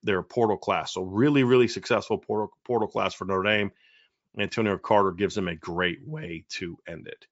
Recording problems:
high frequencies cut off; noticeable; nothing above 8 kHz

